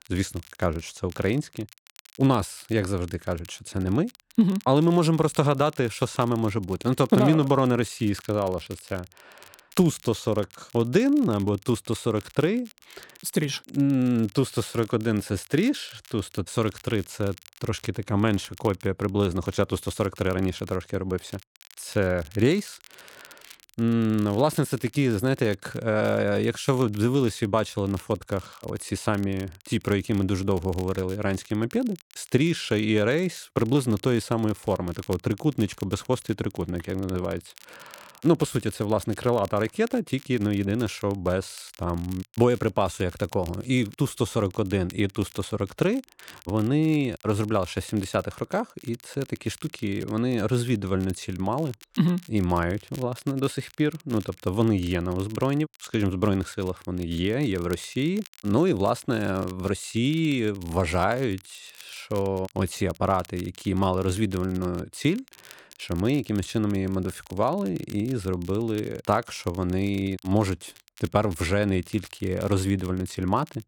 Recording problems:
crackle, like an old record; faint; 25 dB below the speech

